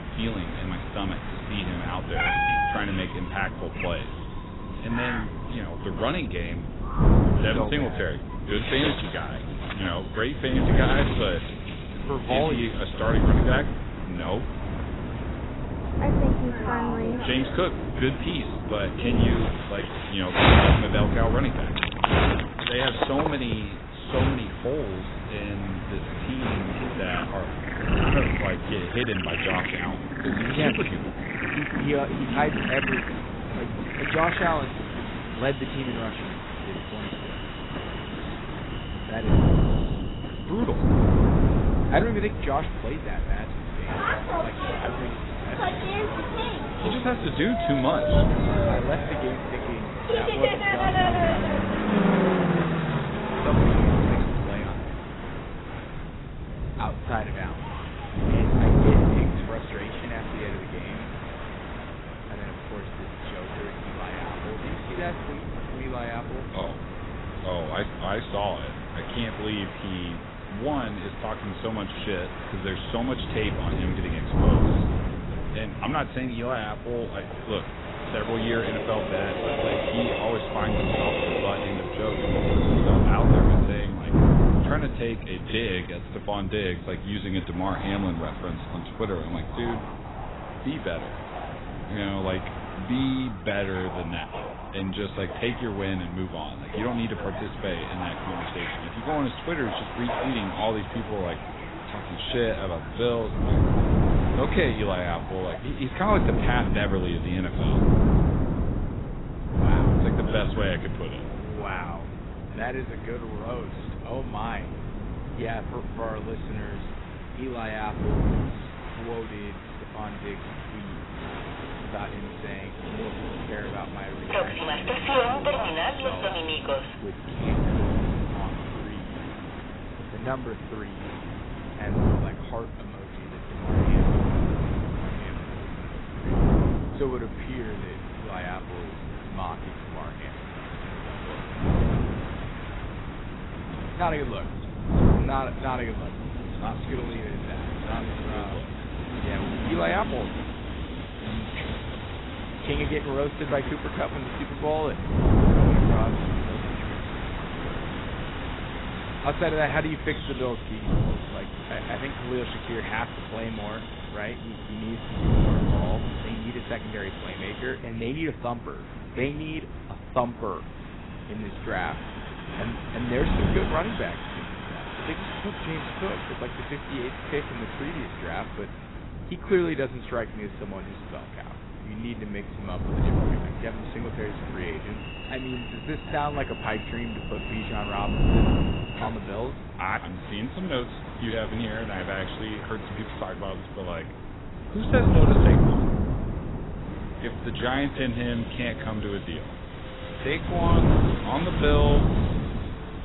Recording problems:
garbled, watery; badly; nothing above 4 kHz
animal sounds; very loud; until 55 s; 2 dB above the speech
wind noise on the microphone; heavy; 4 dB below the speech
train or aircraft noise; loud; throughout; 5 dB below the speech

